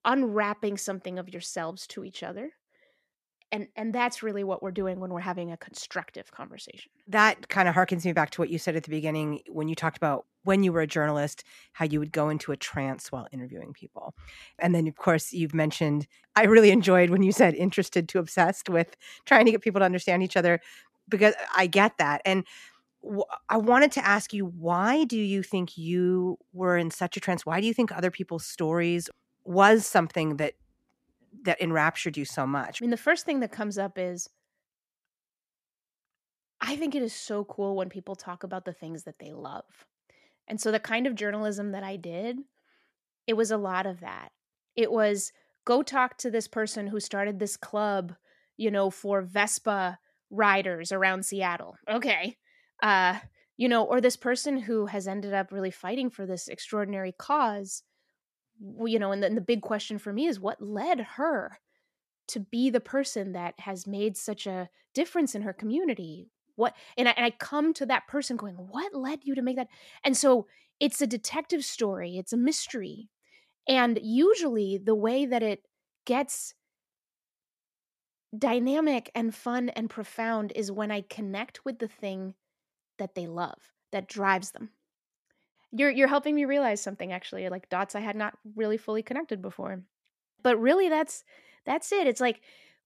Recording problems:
none

